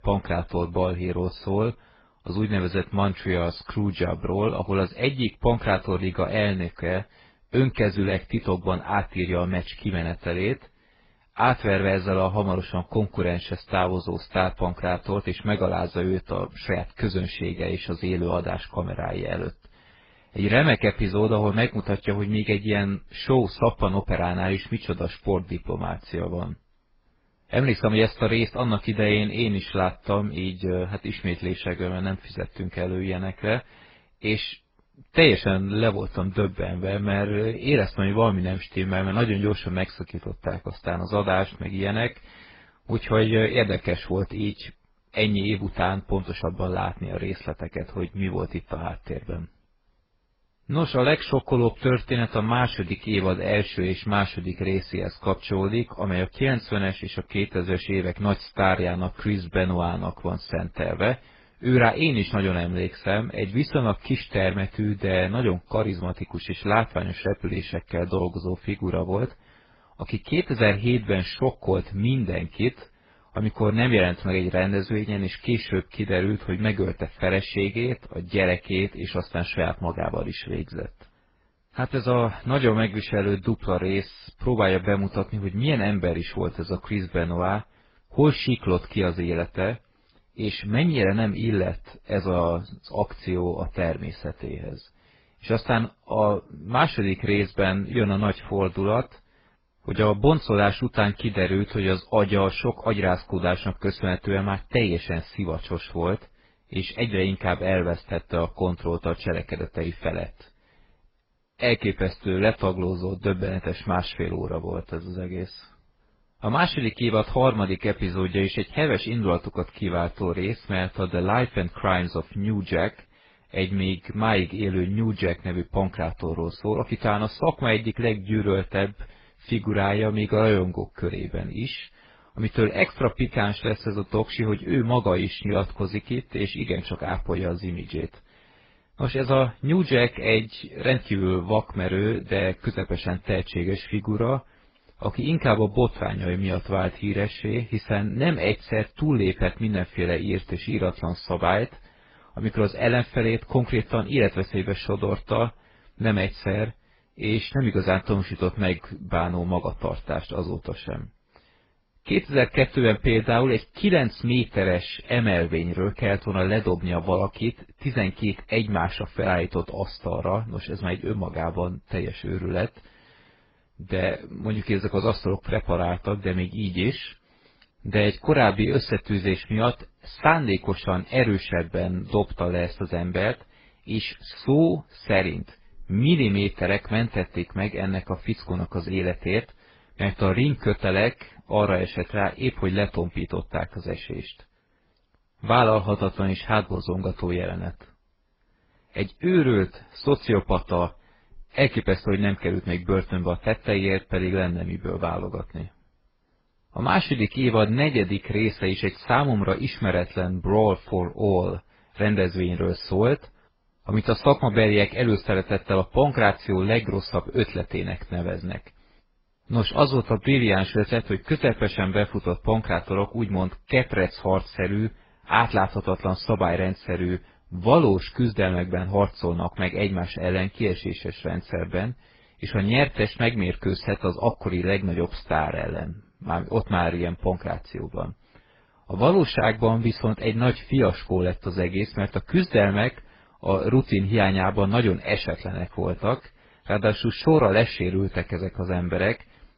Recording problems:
garbled, watery; badly; nothing above 5 kHz

